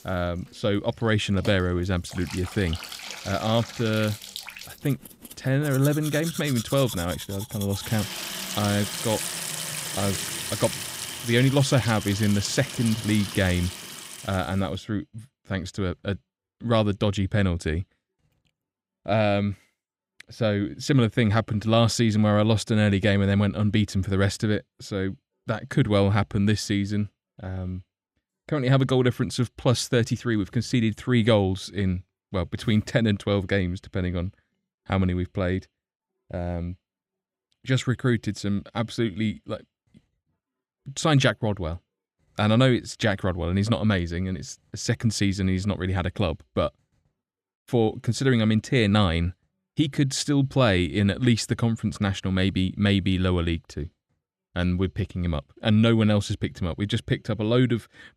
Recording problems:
household noises; loud; until 14 s; 8 dB below the speech

